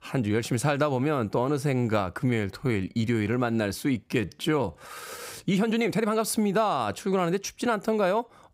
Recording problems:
uneven, jittery; strongly; from 2 to 6 s

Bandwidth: 15.5 kHz